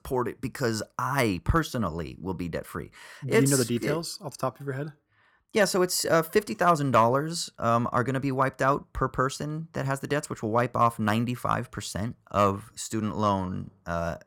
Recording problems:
none

